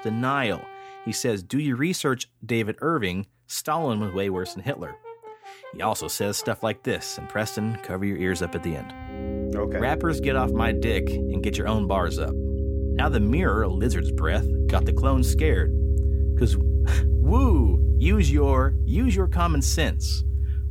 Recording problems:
background music; very loud; throughout; 2 dB above the speech

